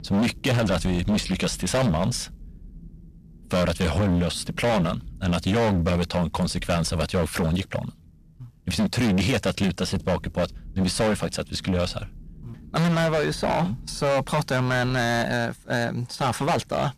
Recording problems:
distortion; heavy; 19% of the sound clipped
rain or running water; noticeable; throughout; 20 dB below the speech

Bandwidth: 14 kHz